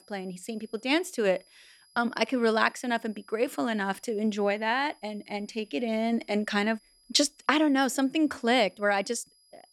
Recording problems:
high-pitched whine; faint; throughout; 5 kHz, 30 dB below the speech

